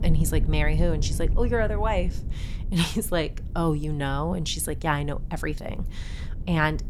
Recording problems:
low rumble; noticeable; throughout; 20 dB below the speech

